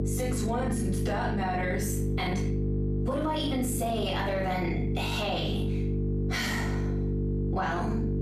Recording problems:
off-mic speech; far
room echo; noticeable; dies away in 0.5 s
squashed, flat; somewhat
electrical hum; loud; throughout; 50 Hz, 7 dB below the speech

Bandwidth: 14 kHz